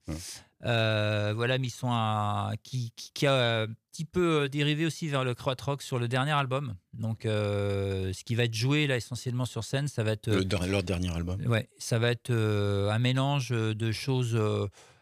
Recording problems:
none

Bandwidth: 14.5 kHz